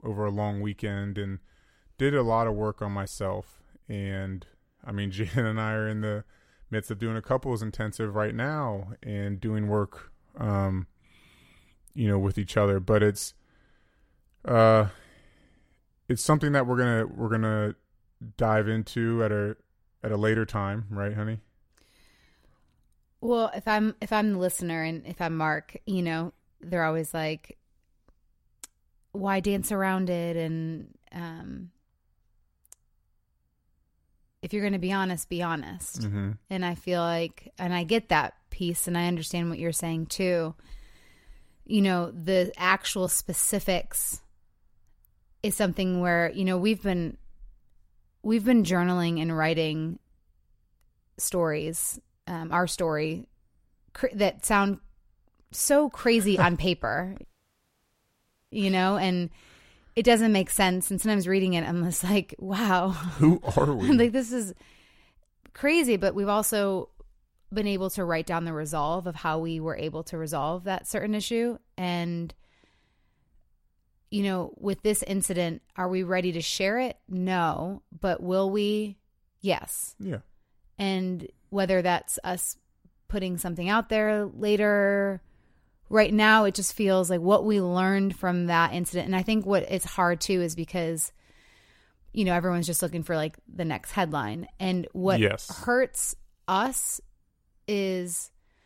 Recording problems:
audio cutting out; at 57 s for 1.5 s

